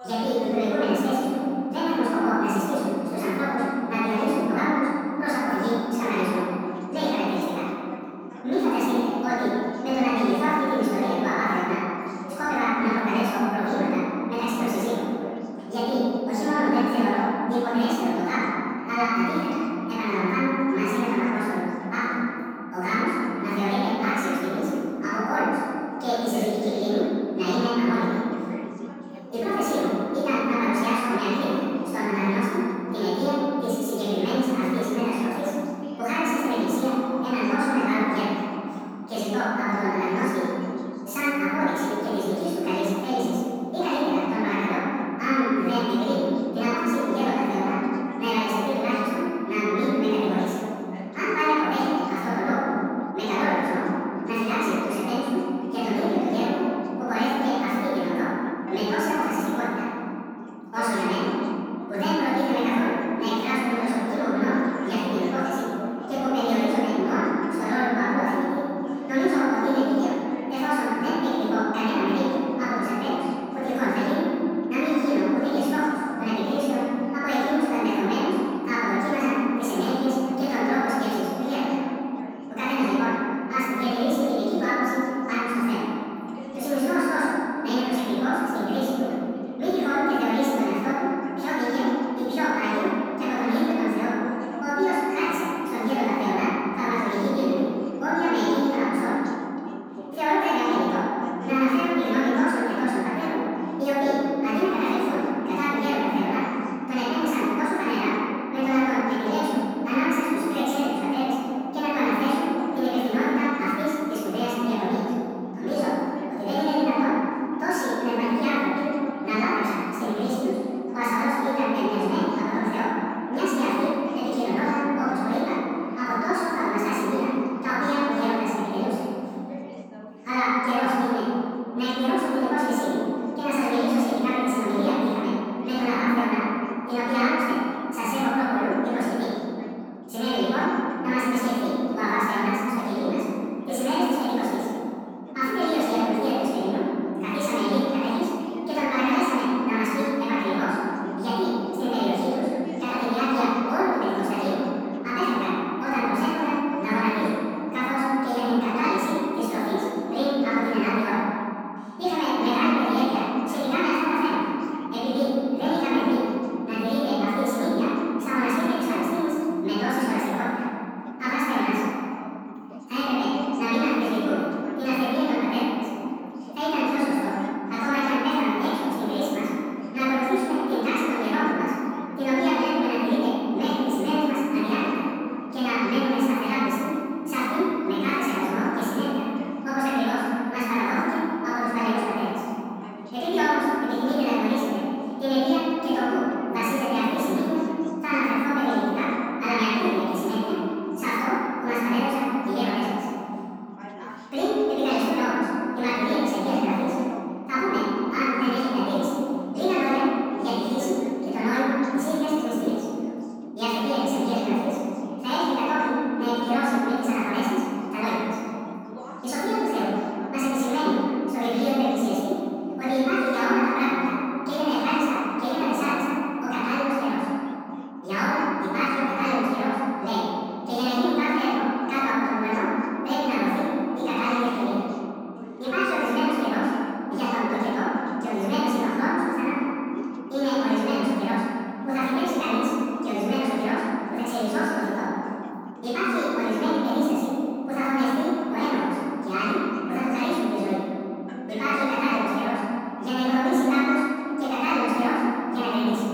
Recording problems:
room echo; strong; dies away in 2.6 s
off-mic speech; far
wrong speed and pitch; too fast and too high; 1.7 times normal speed
background chatter; noticeable; throughout; 2 voices, 20 dB below the speech

